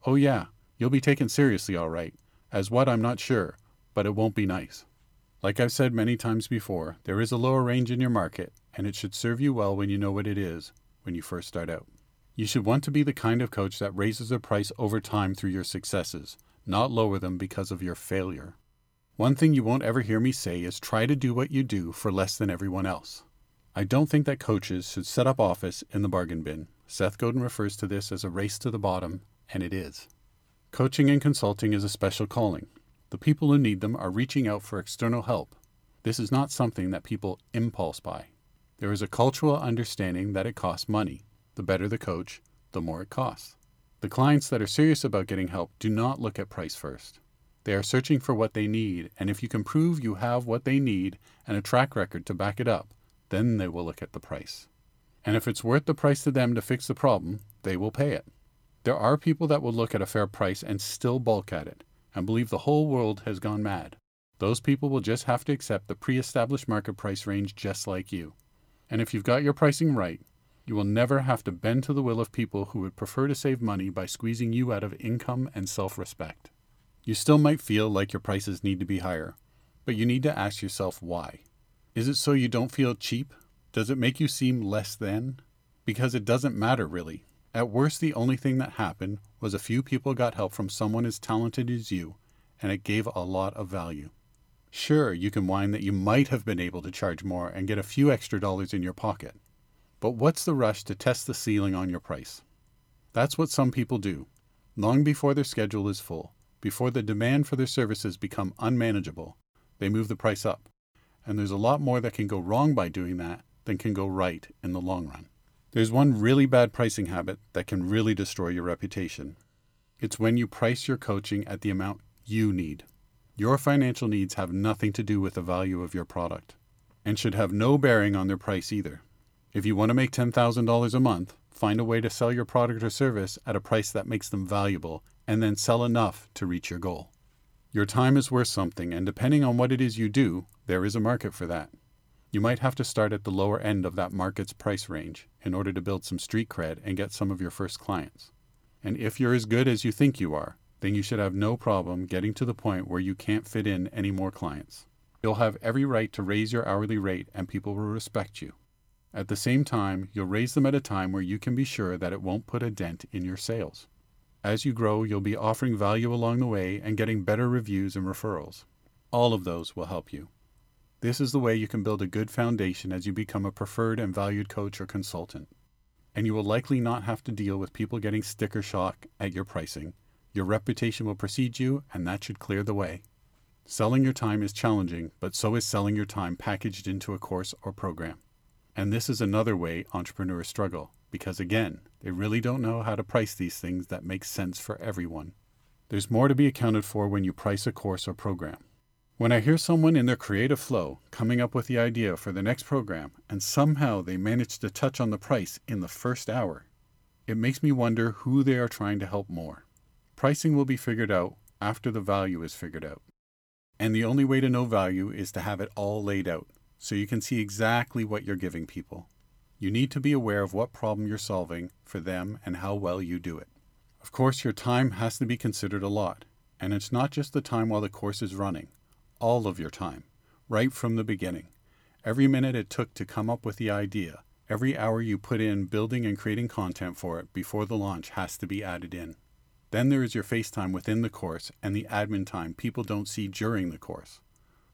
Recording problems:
none

